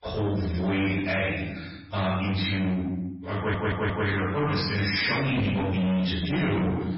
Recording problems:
distortion; heavy; 8 dB below the speech
room echo; strong; dies away in 0.8 s
off-mic speech; far
garbled, watery; badly; nothing above 5.5 kHz
audio stuttering; at 3.5 s

